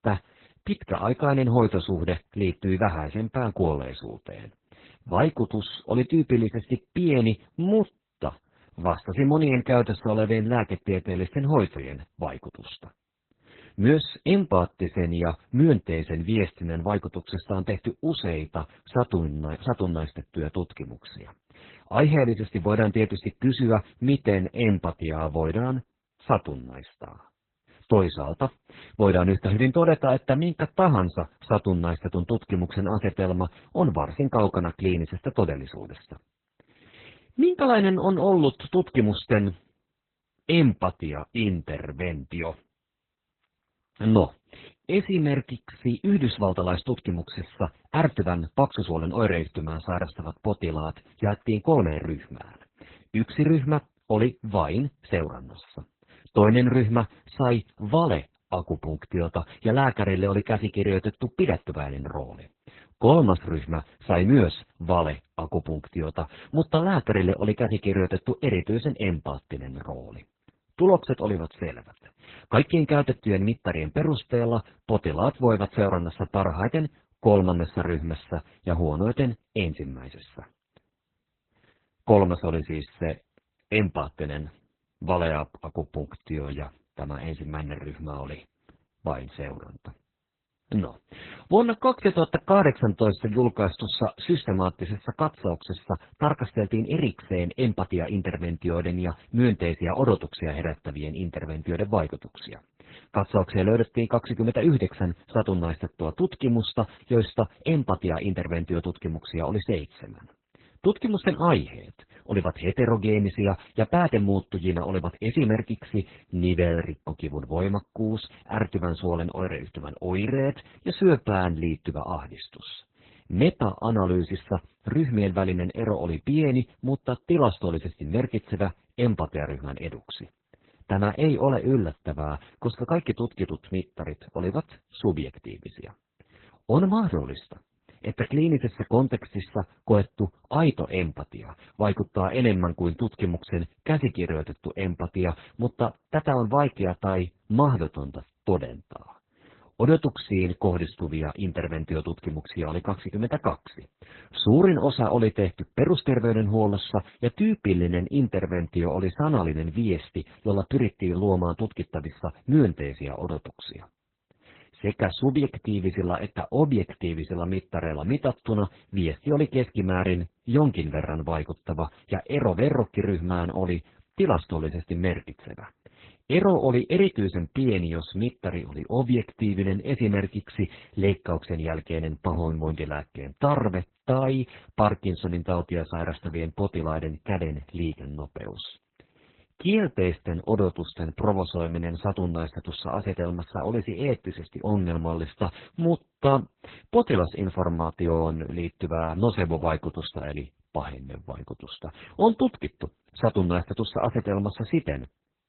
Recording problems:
garbled, watery; badly; nothing above 4 kHz

